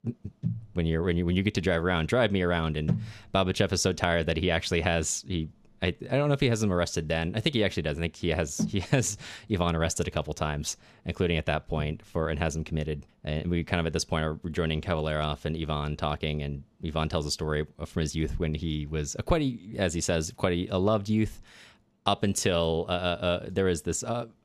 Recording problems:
none

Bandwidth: 14.5 kHz